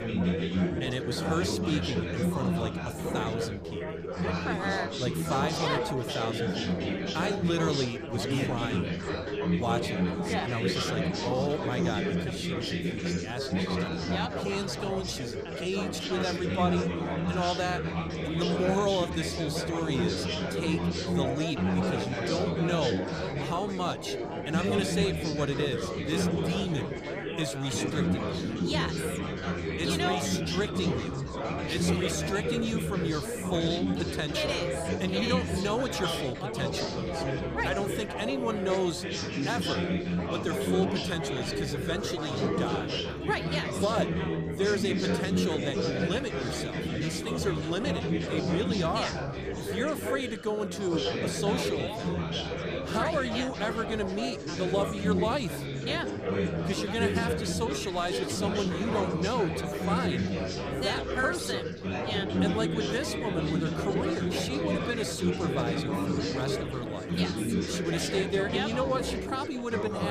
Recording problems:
chatter from many people; very loud; throughout; 2 dB above the speech
abrupt cut into speech; at the end

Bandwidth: 15 kHz